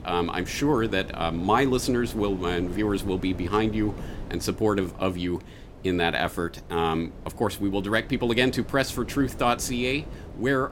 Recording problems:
wind noise on the microphone; occasional gusts; 20 dB below the speech

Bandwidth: 16.5 kHz